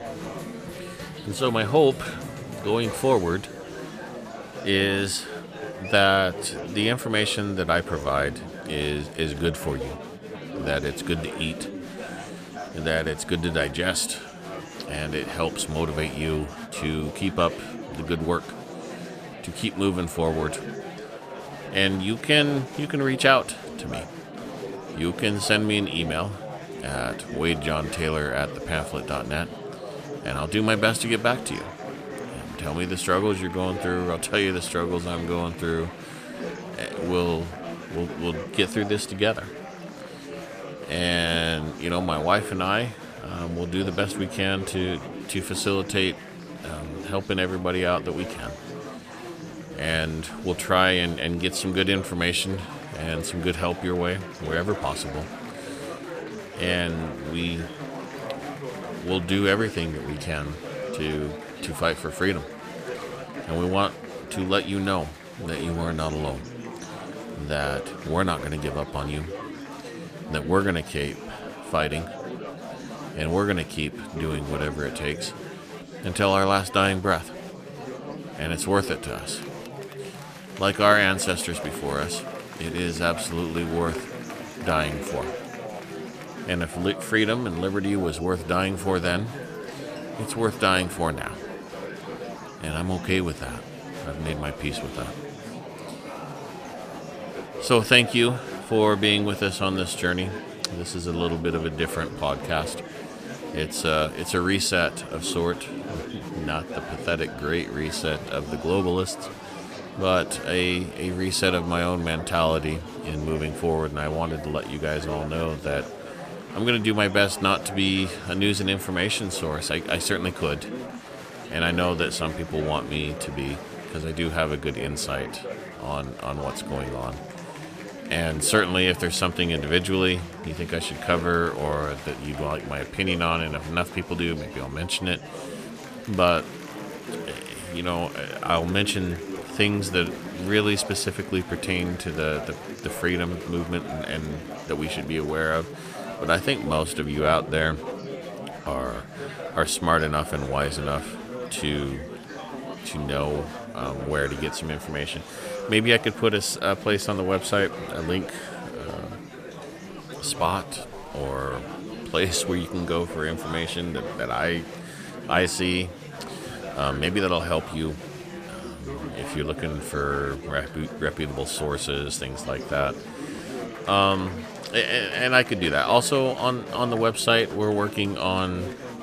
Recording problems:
murmuring crowd; noticeable; throughout; 10 dB below the speech

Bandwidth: 14.5 kHz